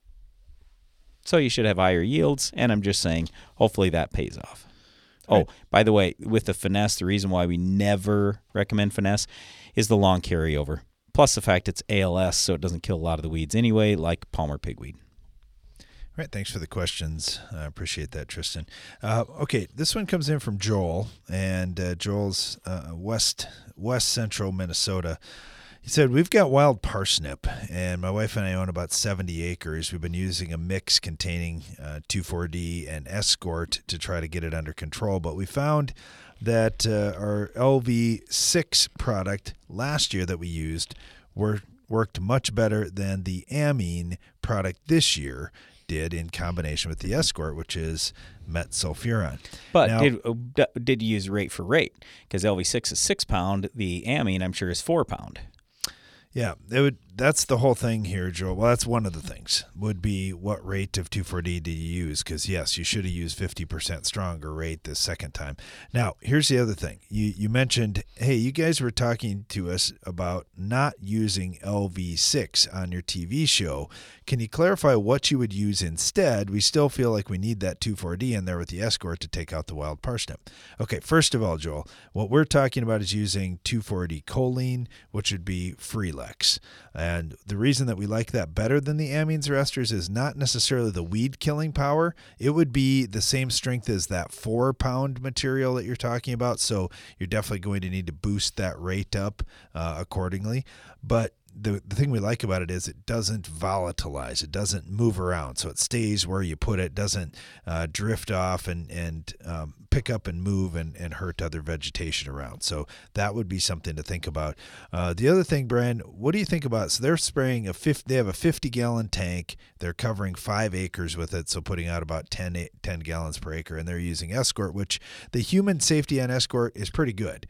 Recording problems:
none

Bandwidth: 18.5 kHz